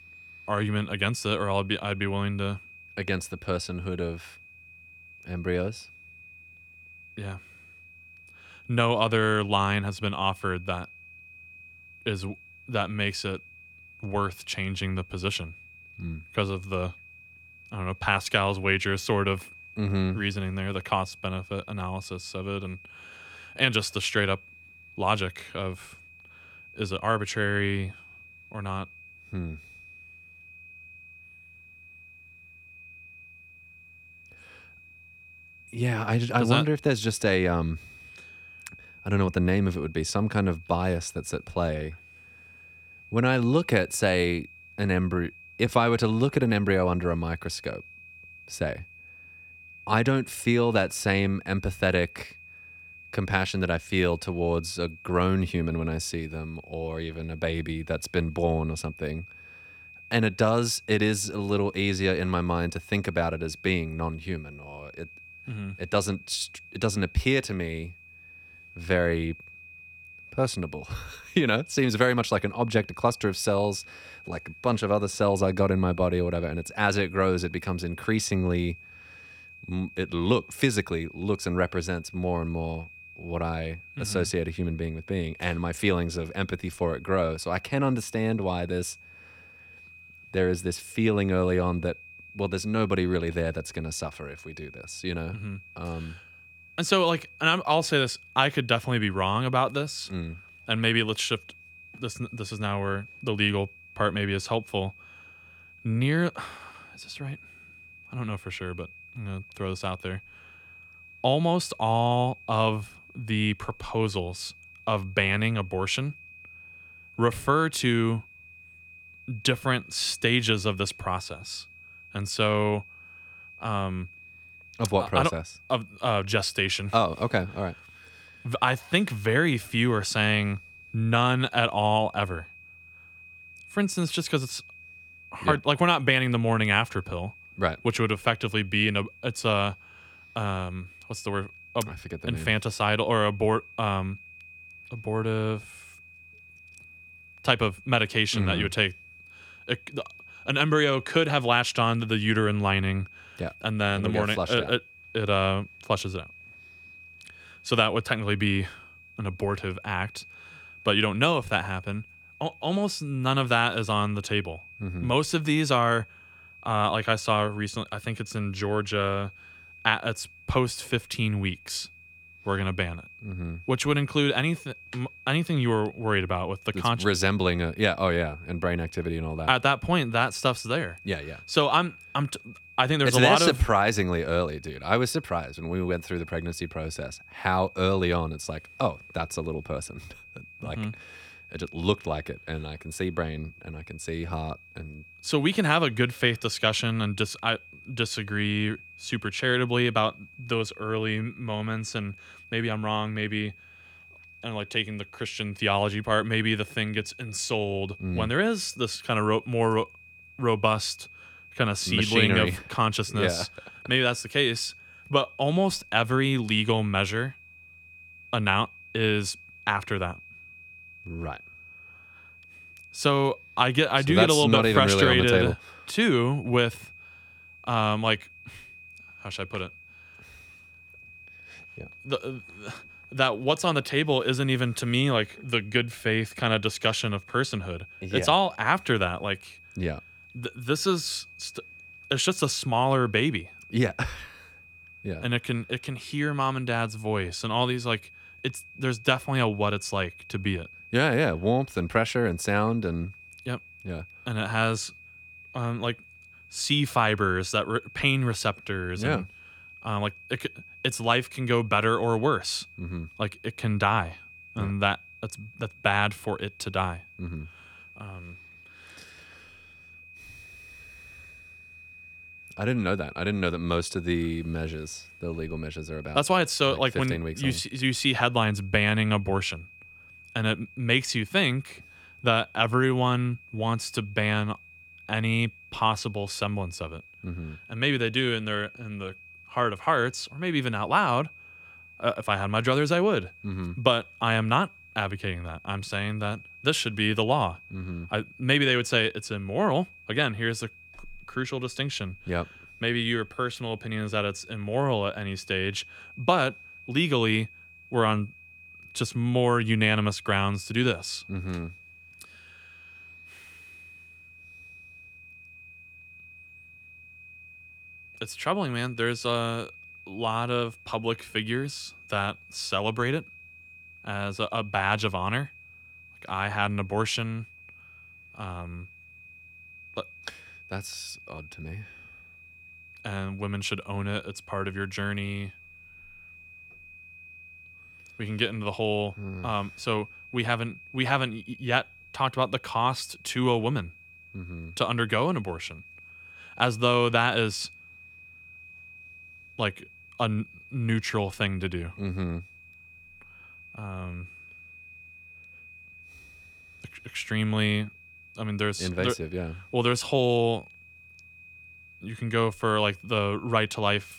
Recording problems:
high-pitched whine; faint; throughout; 2.5 kHz, 20 dB below the speech

